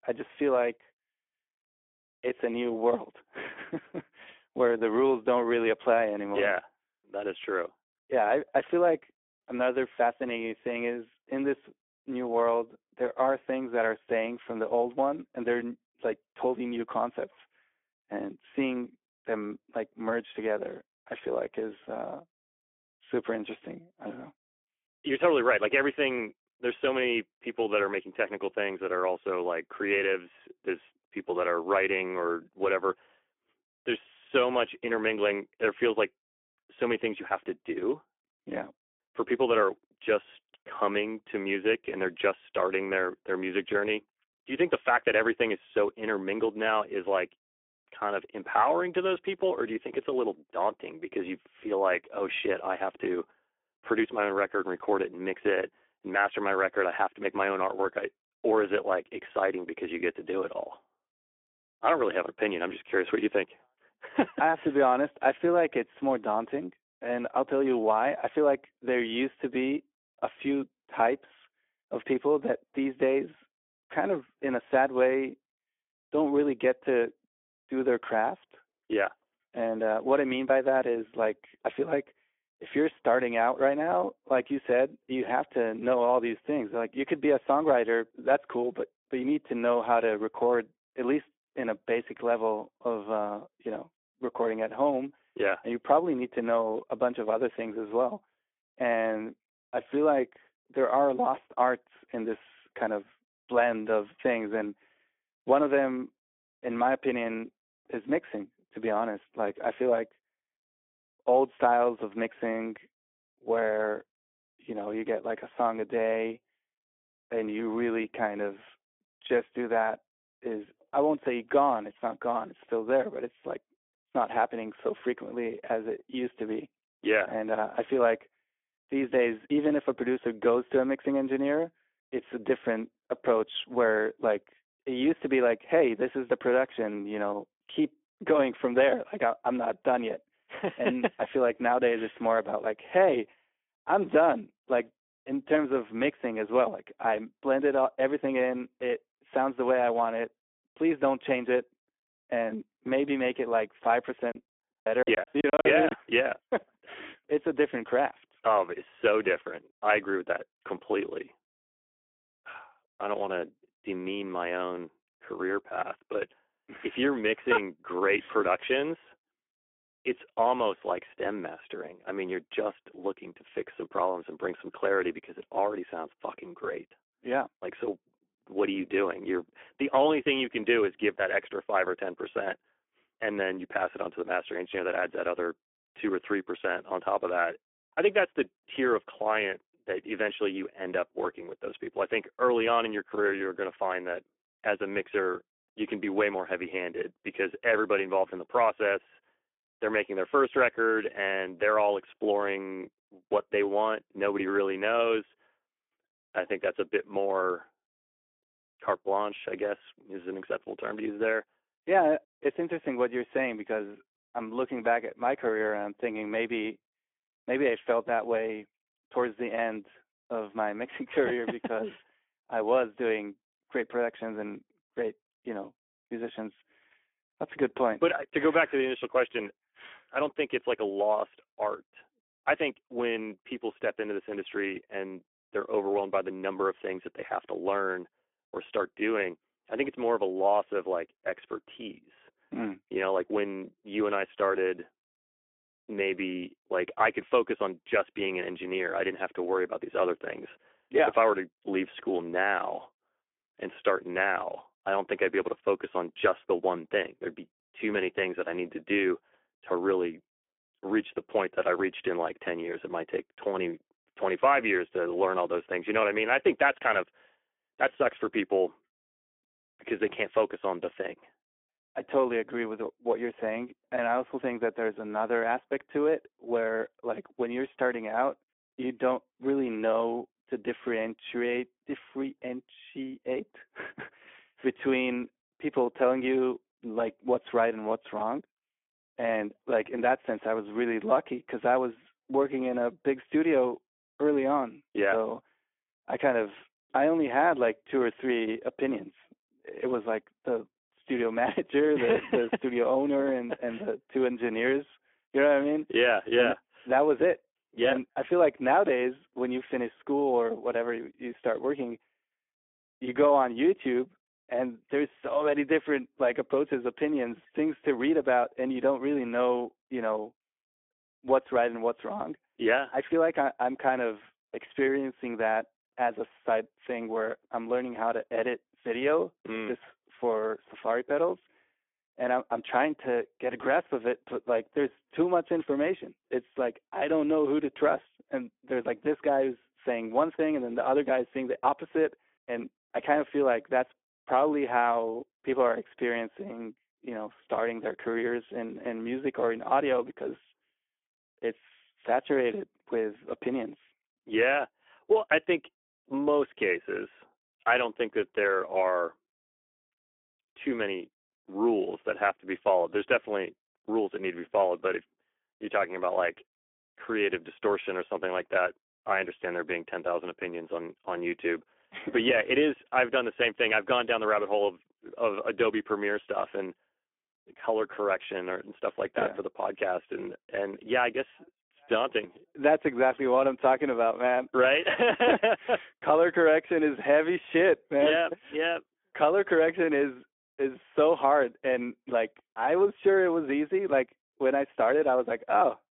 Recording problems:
phone-call audio; nothing above 3 kHz
choppy; very; from 2:34 to 2:36; 24% of the speech affected

